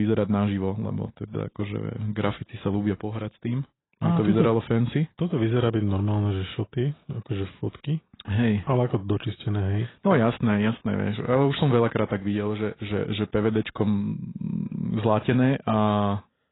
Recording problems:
garbled, watery; badly; nothing above 4 kHz
abrupt cut into speech; at the start

